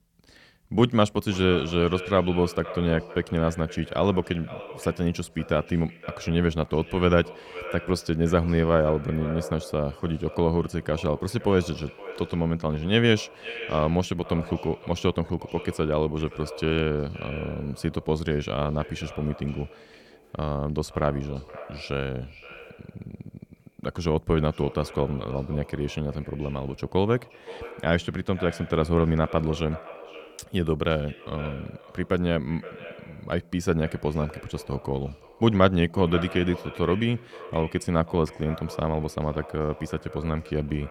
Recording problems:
echo of what is said; noticeable; throughout; 520 ms later, 15 dB below the speech

